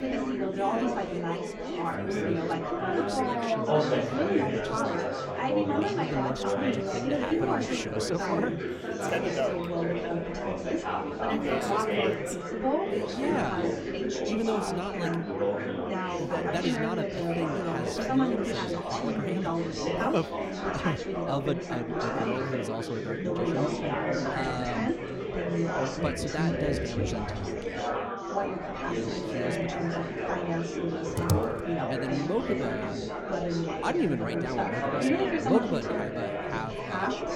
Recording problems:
chatter from many people; very loud; throughout; 5 dB above the speech
keyboard typing; loud; at 31 s; peak 5 dB above the speech

